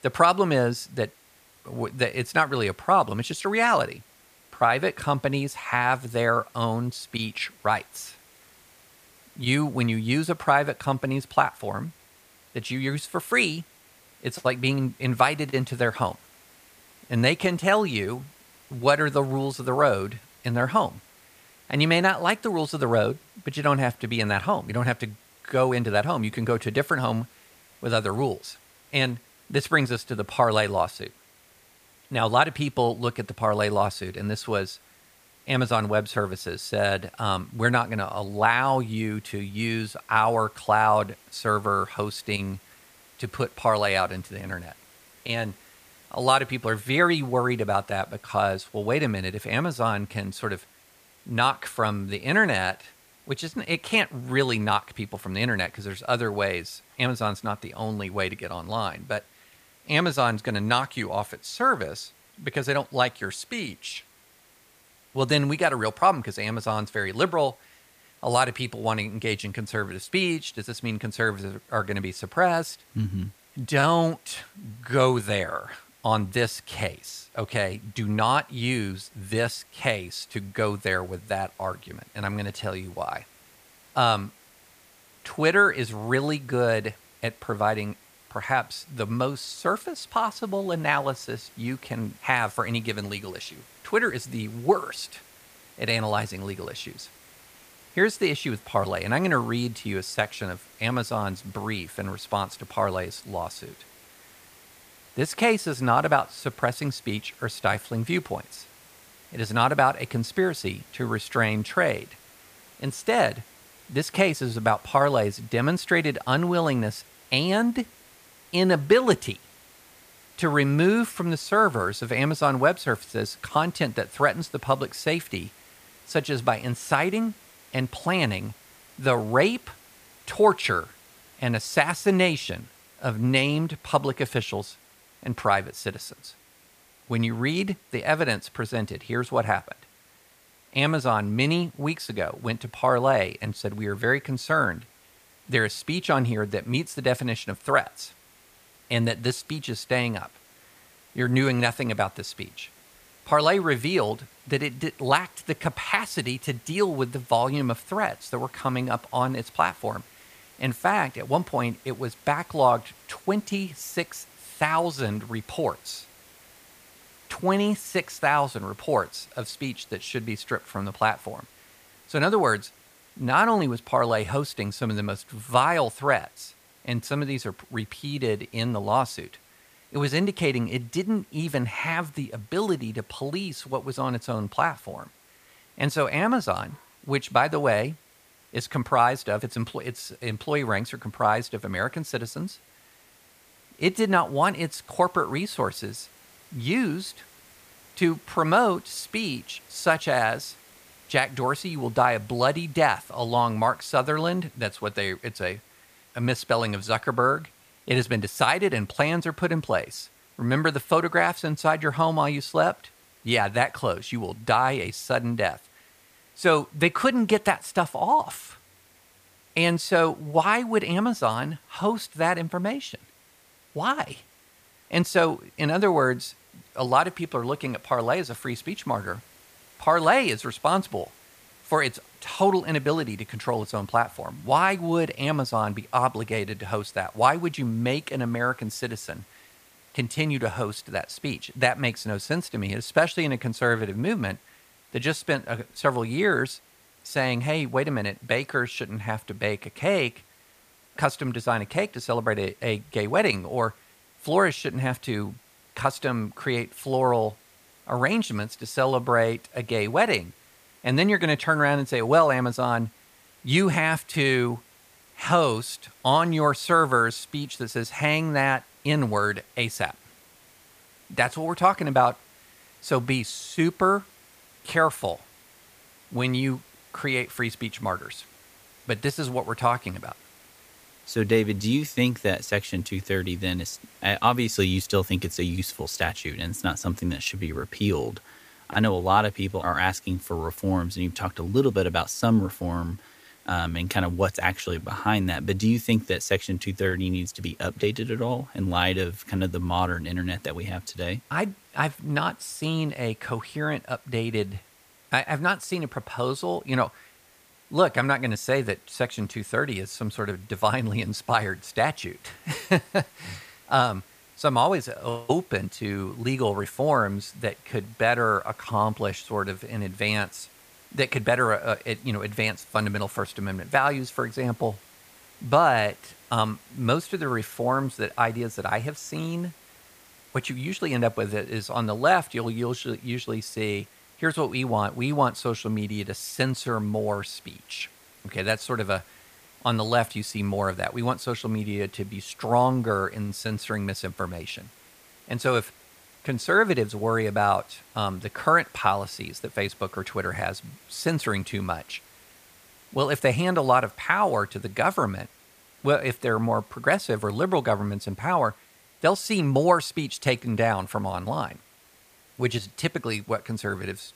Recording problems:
hiss; faint; throughout; 25 dB below the speech

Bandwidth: 15 kHz